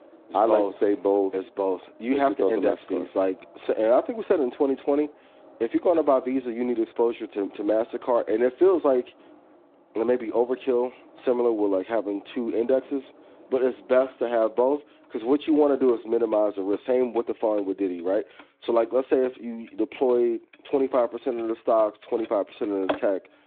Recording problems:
phone-call audio; nothing above 3.5 kHz
traffic noise; faint; throughout; 20 dB below the speech

